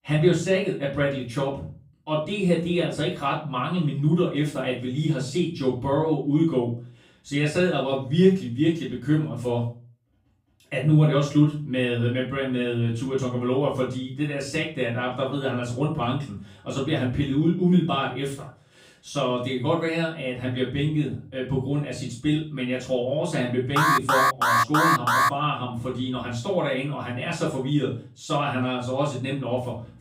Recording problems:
off-mic speech; far
room echo; slight; dies away in 0.3 s
alarm; loud; from 24 to 25 s; peak 5 dB above the speech

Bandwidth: 15.5 kHz